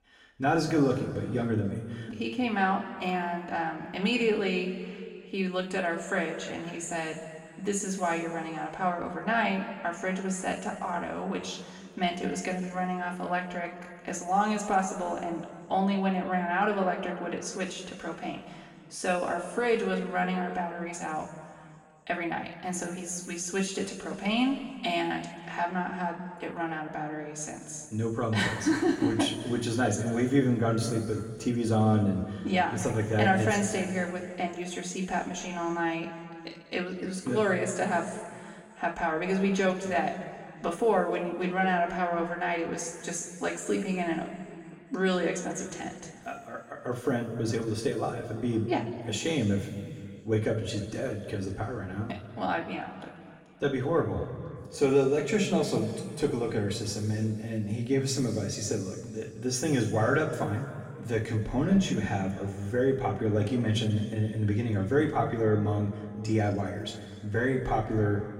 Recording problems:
off-mic speech; far
room echo; noticeable; dies away in 2 s

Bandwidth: 16 kHz